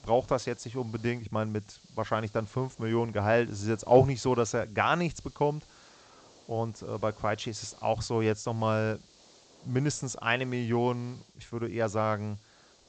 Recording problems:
high frequencies cut off; noticeable; nothing above 8 kHz
hiss; faint; throughout; 25 dB below the speech

